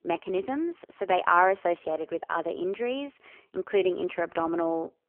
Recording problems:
phone-call audio; poor line; nothing above 3 kHz

